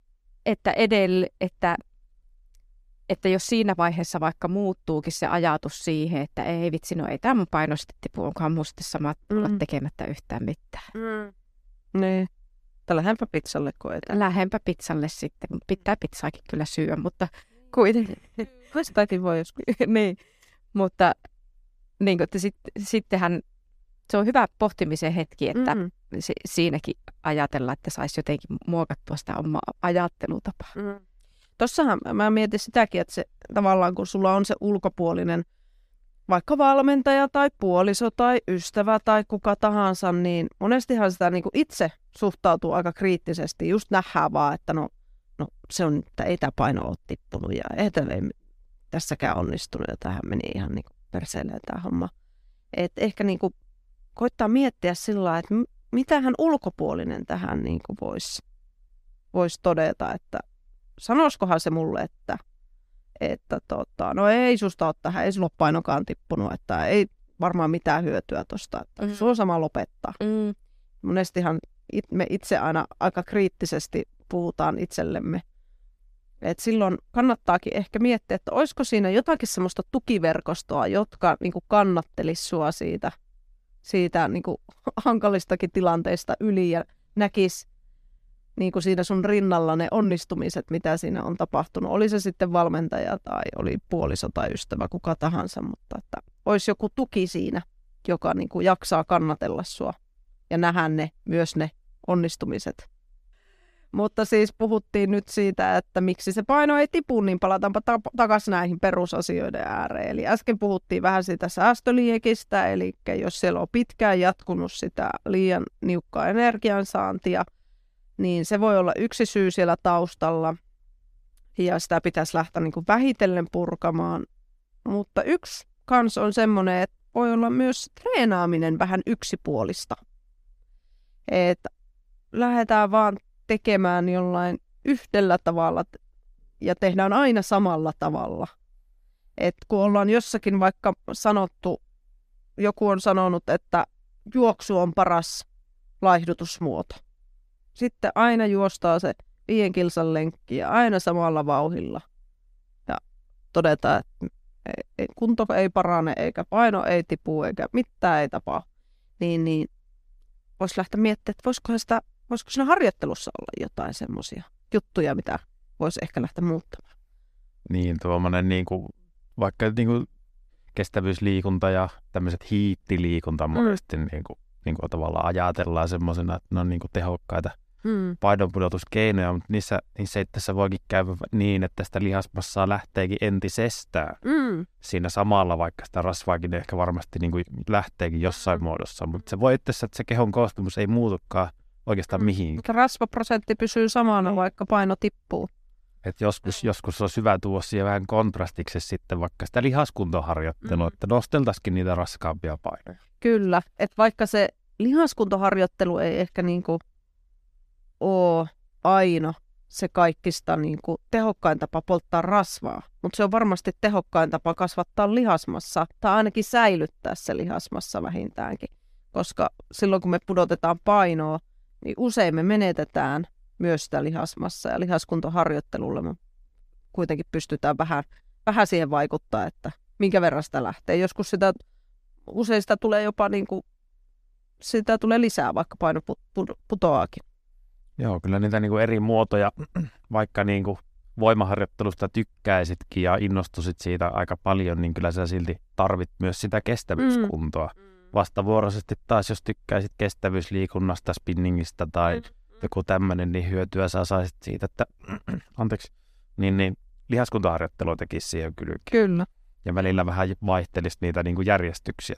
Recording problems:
none

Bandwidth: 14.5 kHz